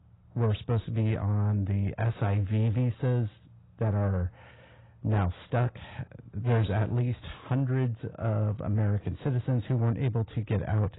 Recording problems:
garbled, watery; badly; nothing above 4 kHz
distortion; slight; 10 dB below the speech

